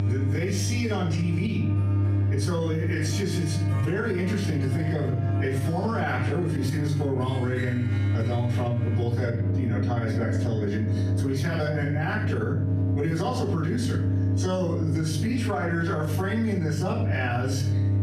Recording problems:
off-mic speech; far
room echo; noticeable; dies away in 0.5 s
squashed, flat; somewhat
electrical hum; loud; throughout; 50 Hz, 10 dB below the speech
background music; noticeable; throughout; 10 dB below the speech

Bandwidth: 14.5 kHz